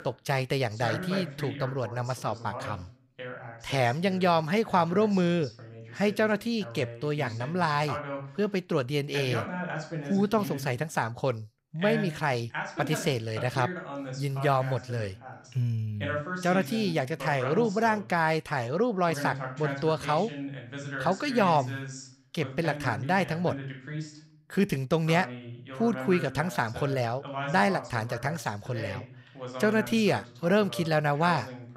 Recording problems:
voice in the background; loud; throughout; 10 dB below the speech

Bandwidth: 15.5 kHz